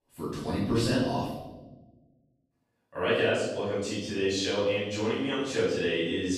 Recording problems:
room echo; strong; dies away in 1 s
off-mic speech; far

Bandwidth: 15.5 kHz